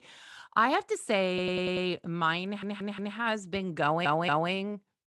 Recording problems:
audio stuttering; at 1.5 s, at 2.5 s and at 4 s

